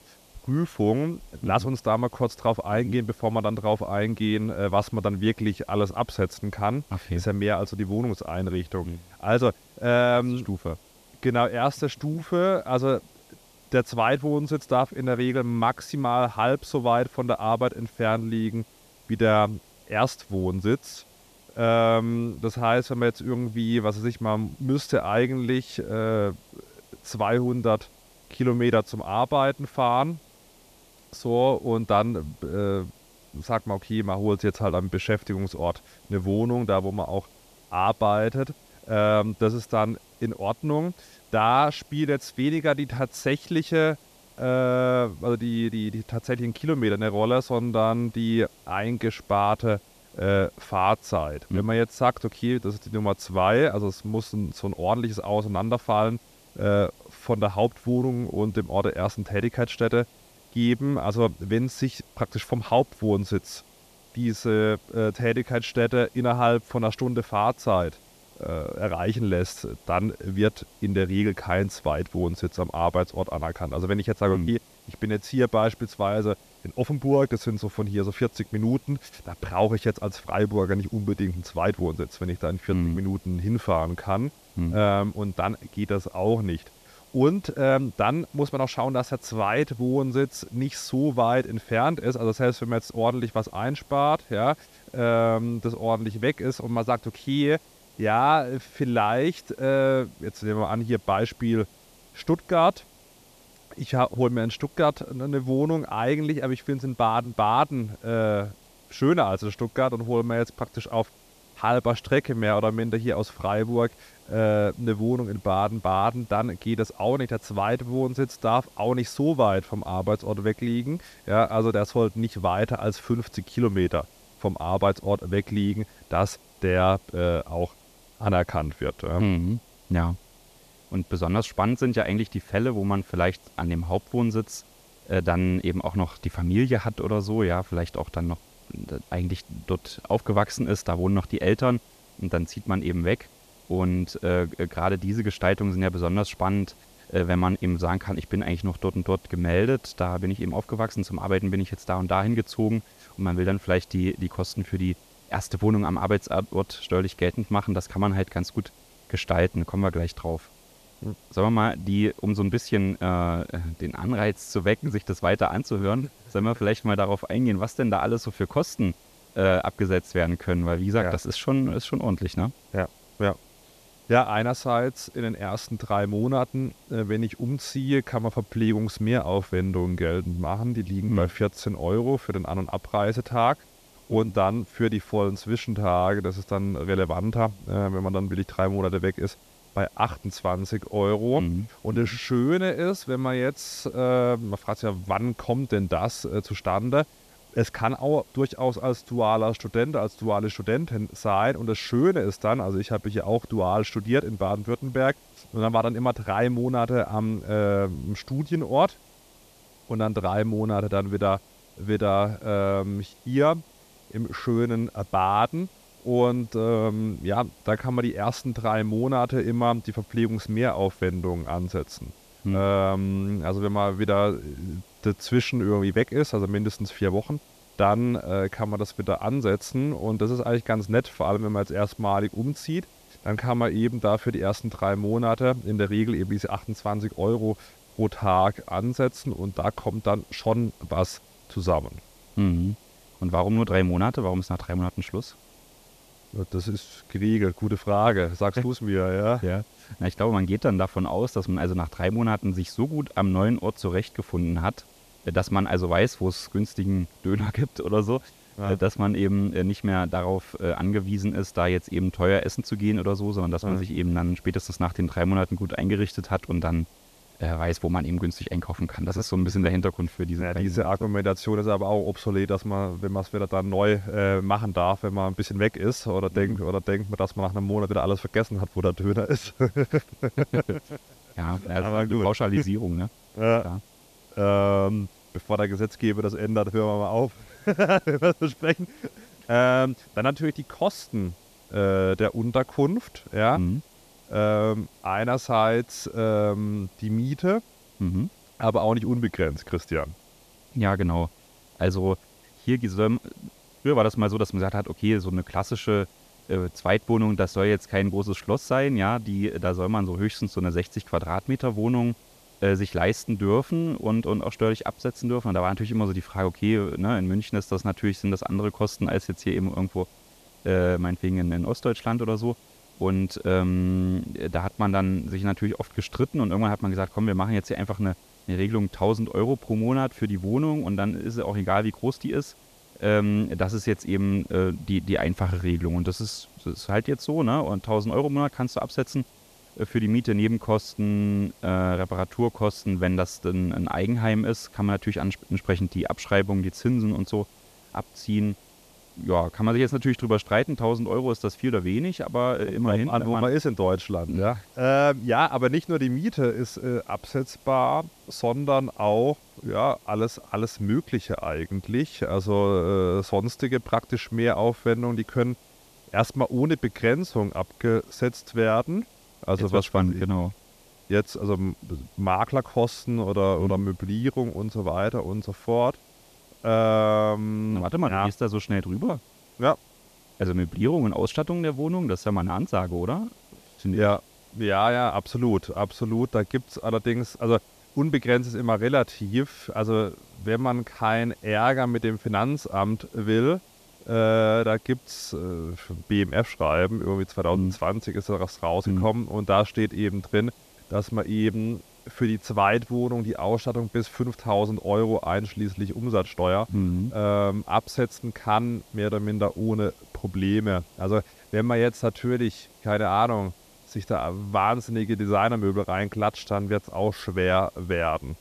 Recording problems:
hiss; faint; throughout; 25 dB below the speech

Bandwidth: 14.5 kHz